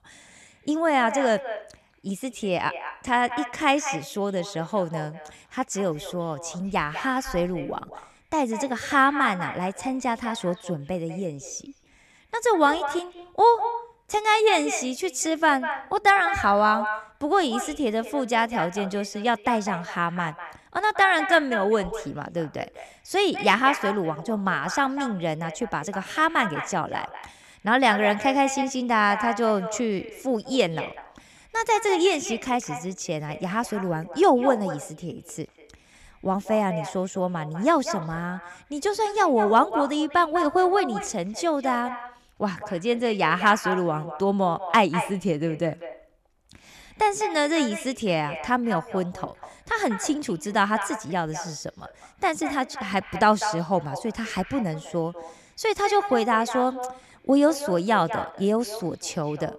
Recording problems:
echo of what is said; strong; throughout; 200 ms later, 10 dB below the speech

